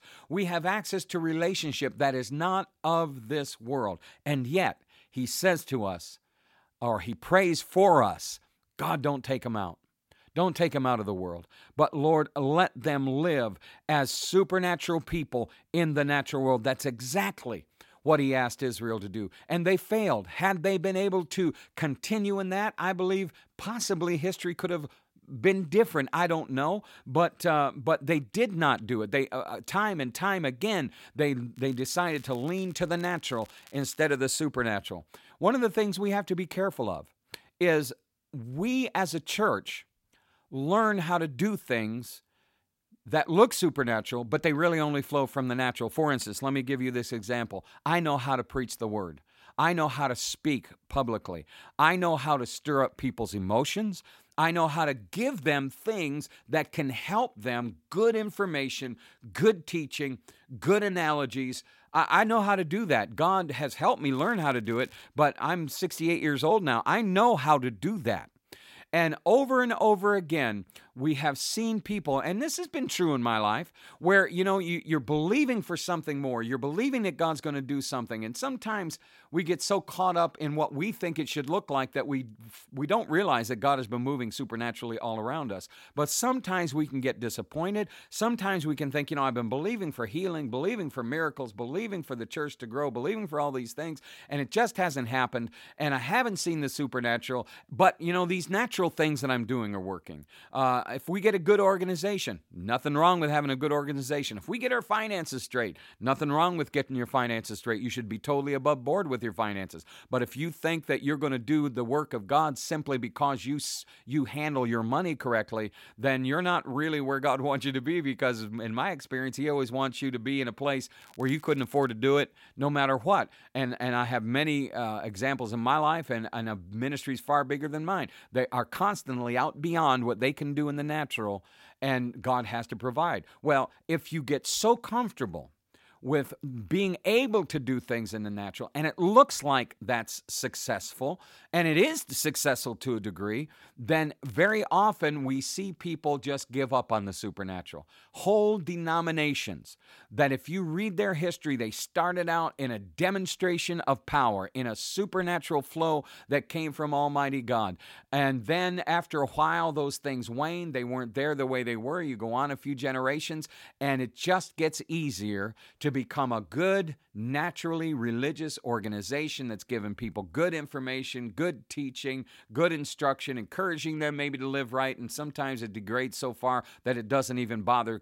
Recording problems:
crackling; faint; 4 times, first at 32 s; 25 dB below the speech

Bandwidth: 16.5 kHz